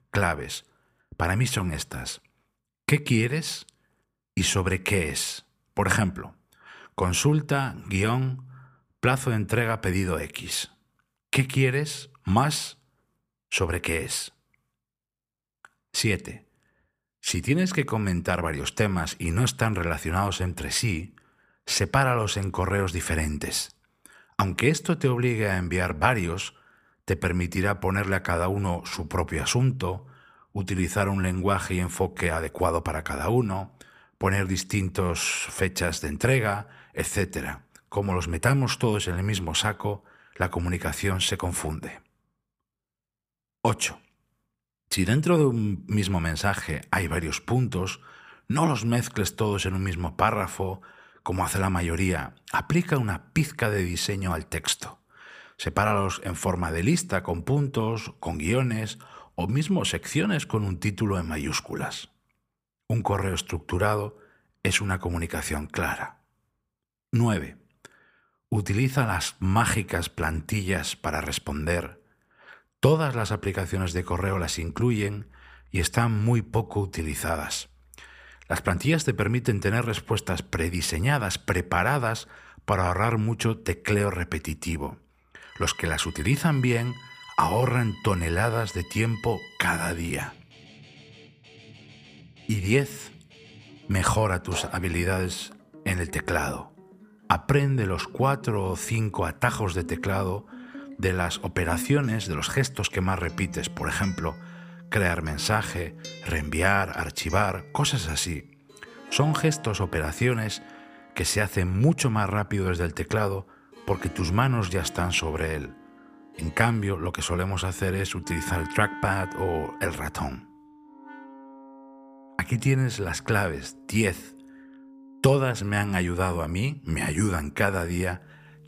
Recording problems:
background music; noticeable; from 1:14 on; 20 dB below the speech

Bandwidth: 15 kHz